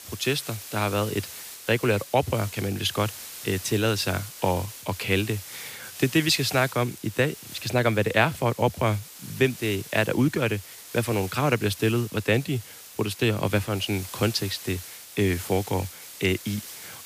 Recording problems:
hiss; noticeable; throughout; 15 dB below the speech

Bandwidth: 15 kHz